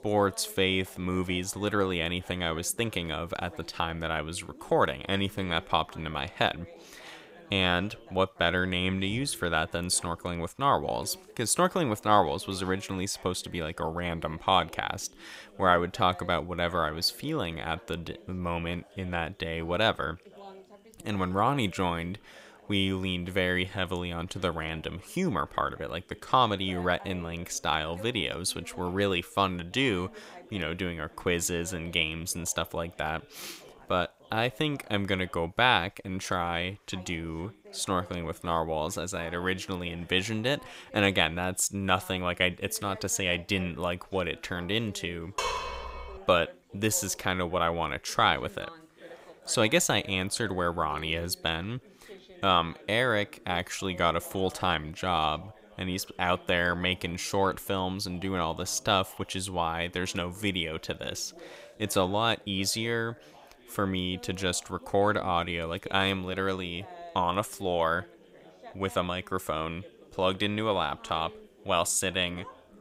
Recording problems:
background chatter; faint; throughout; 2 voices, 20 dB below the speech
clattering dishes; noticeable; at 45 s; peak 2 dB below the speech

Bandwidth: 15.5 kHz